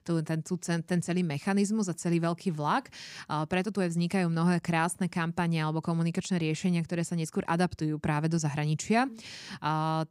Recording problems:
none

